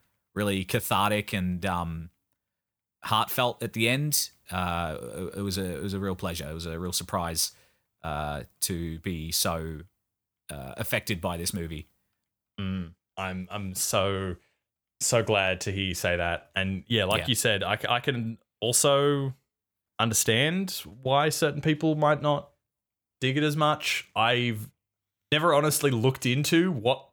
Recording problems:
none

